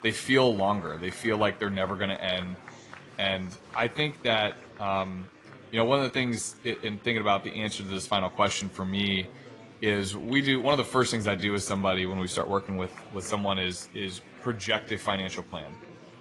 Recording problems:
garbled, watery; slightly; nothing above 10.5 kHz
murmuring crowd; faint; throughout; 20 dB below the speech

